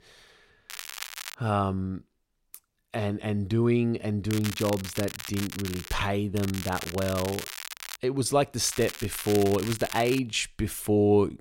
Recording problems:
crackling; loud; 4 times, first at 0.5 s; 10 dB below the speech

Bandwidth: 16 kHz